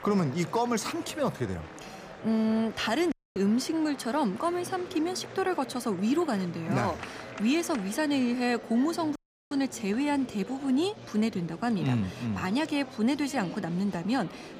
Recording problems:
murmuring crowd; noticeable; throughout; 15 dB below the speech
audio cutting out; at 3 s and at 9 s

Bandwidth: 15 kHz